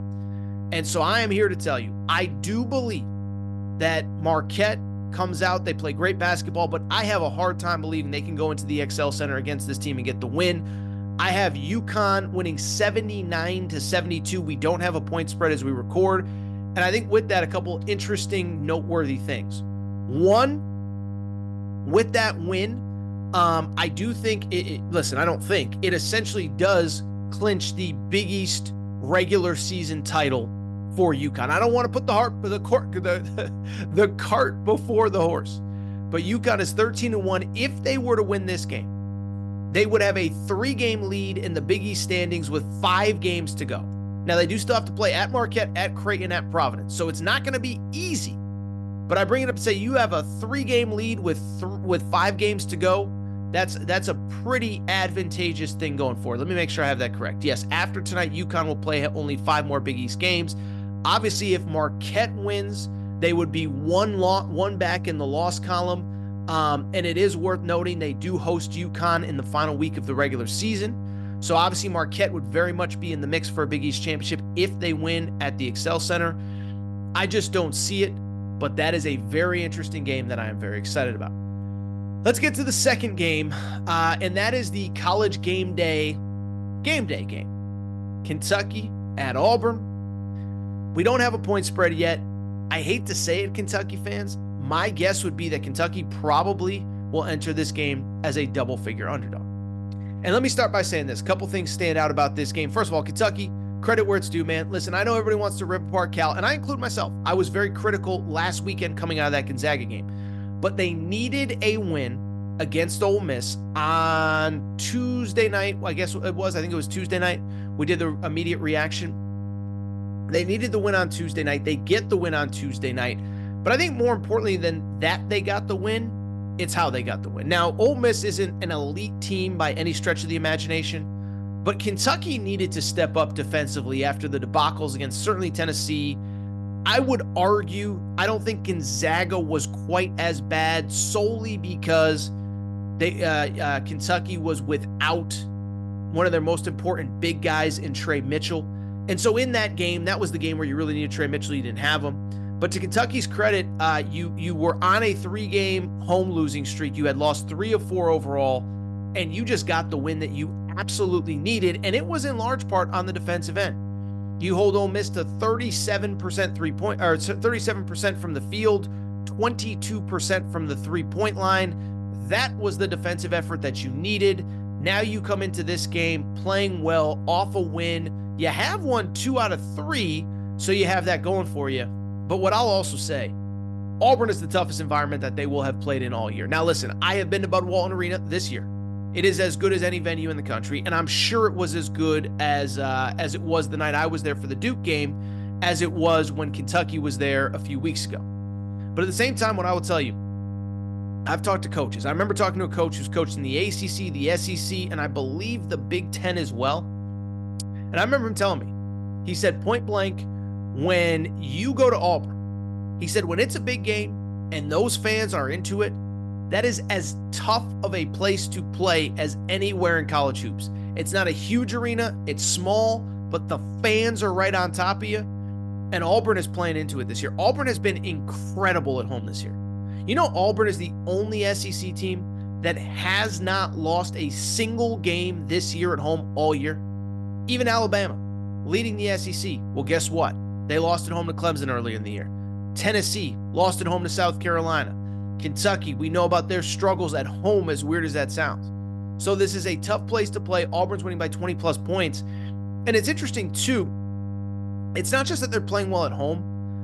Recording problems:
electrical hum; noticeable; throughout; 50 Hz, 15 dB below the speech

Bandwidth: 15.5 kHz